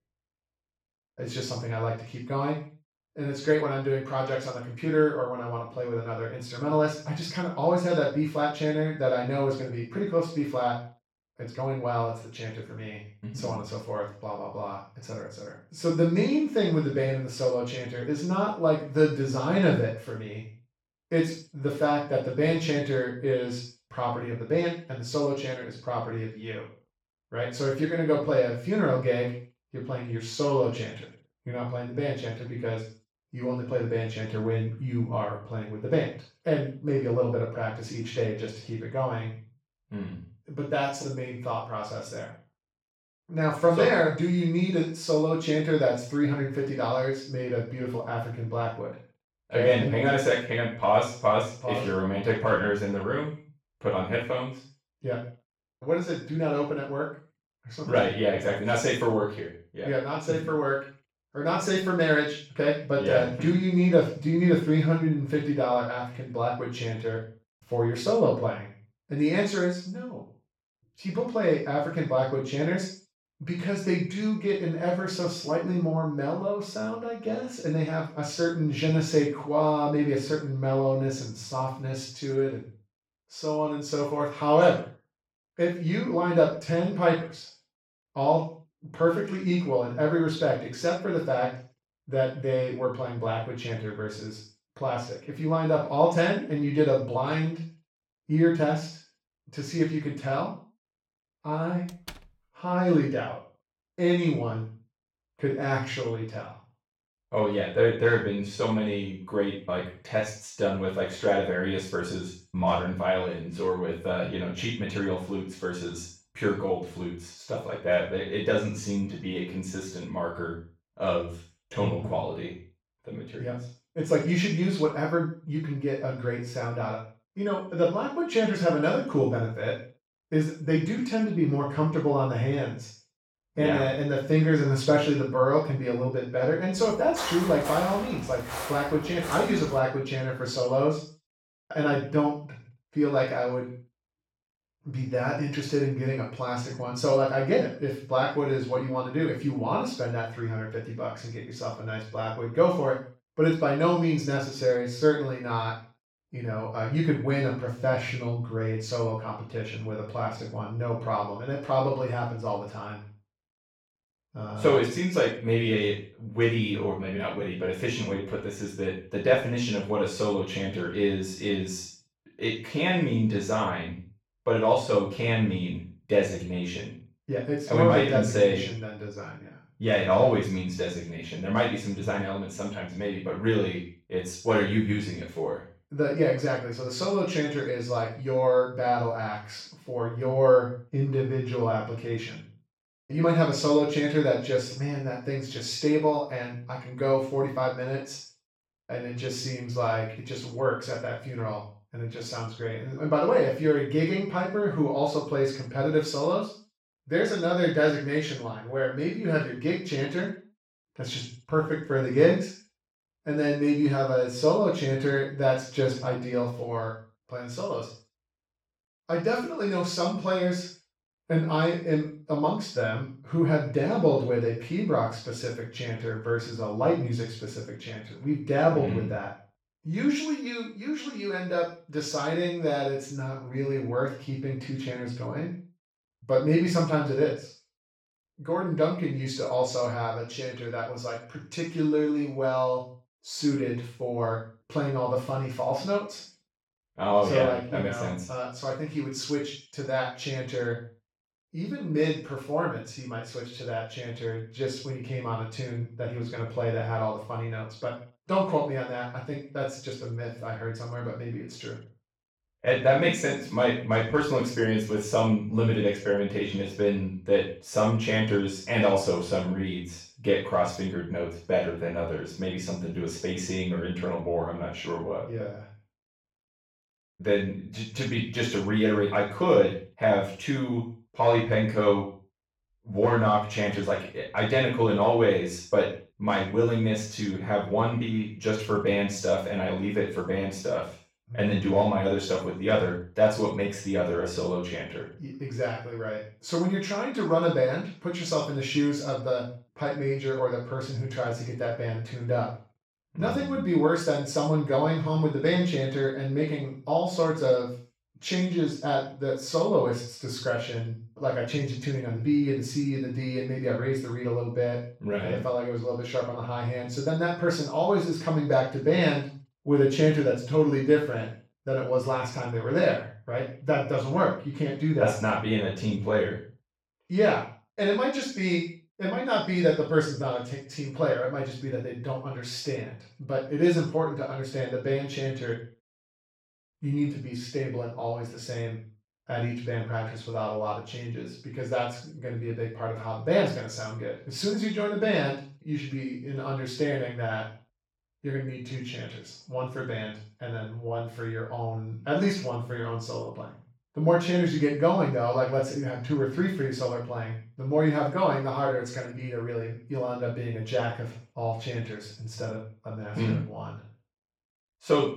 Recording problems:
off-mic speech; far
room echo; noticeable; dies away in 0.4 s
door banging; faint; at 1:42; peak 15 dB below the speech
footsteps; noticeable; from 2:17 to 2:20; peak 5 dB below the speech

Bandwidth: 16.5 kHz